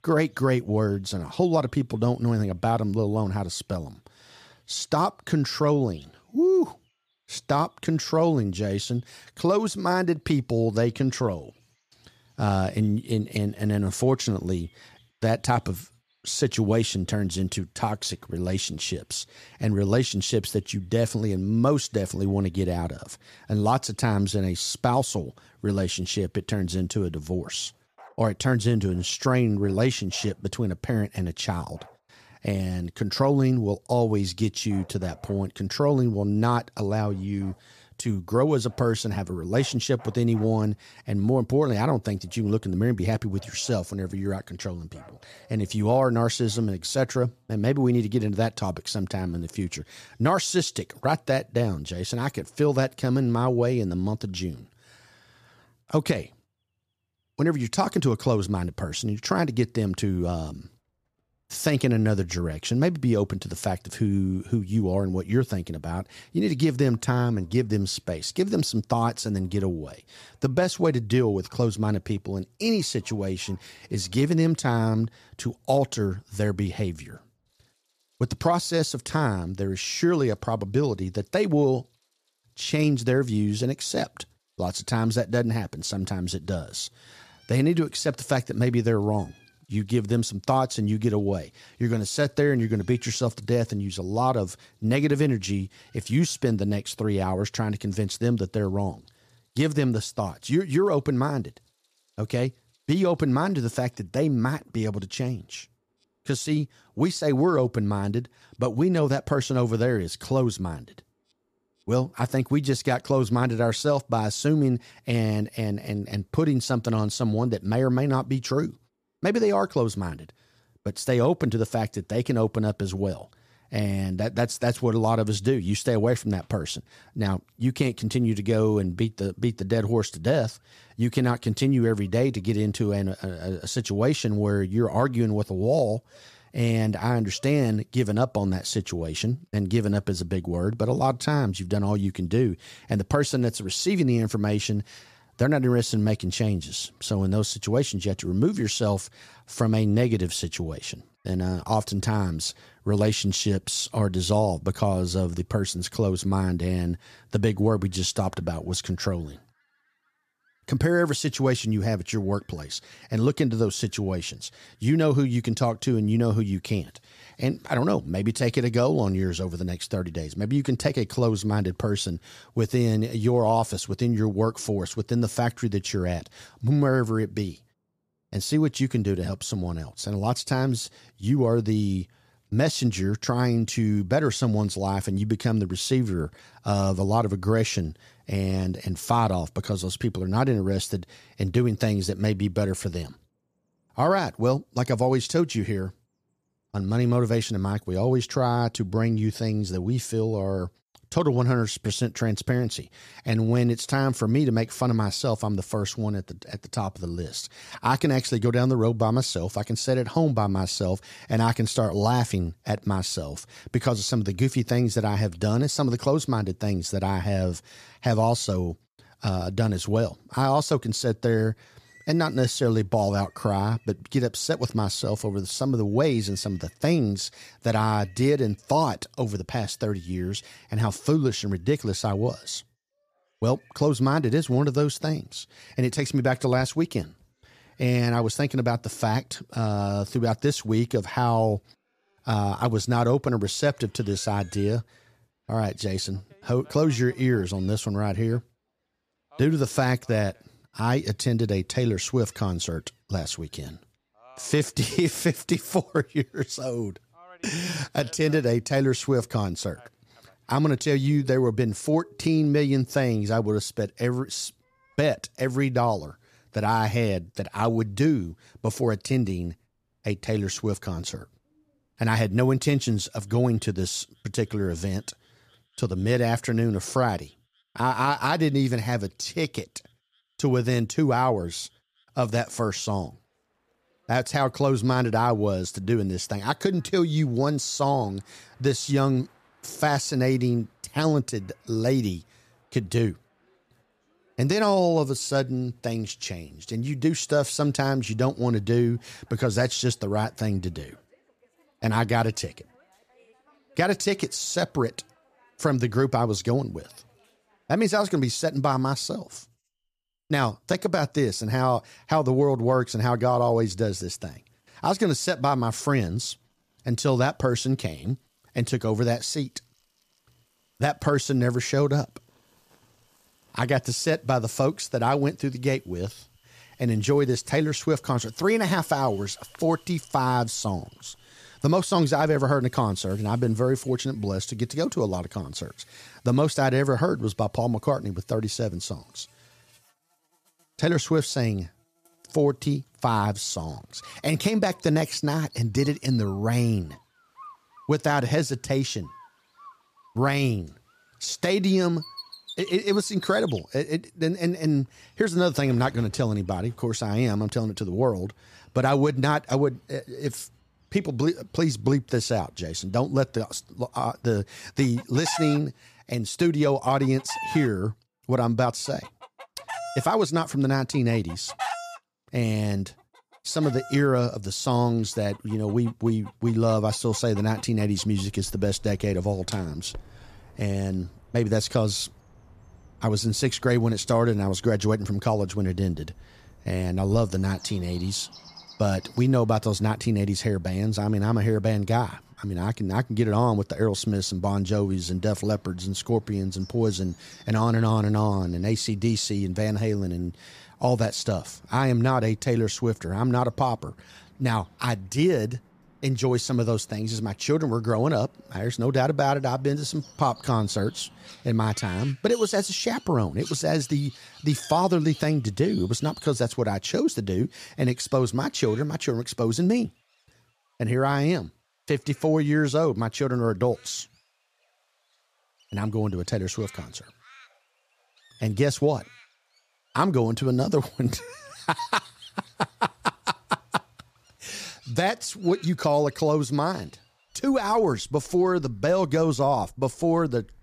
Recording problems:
animal sounds; faint; throughout; 25 dB below the speech

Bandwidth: 14.5 kHz